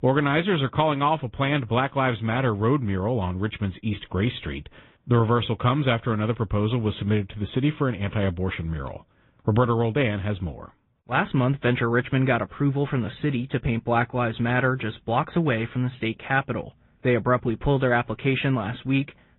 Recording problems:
high frequencies cut off; severe; nothing above 3.5 kHz
garbled, watery; slightly

